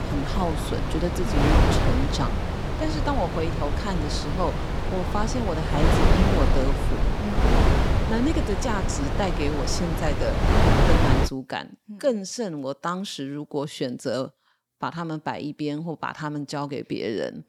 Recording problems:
wind noise on the microphone; heavy; until 11 s; 2 dB above the speech

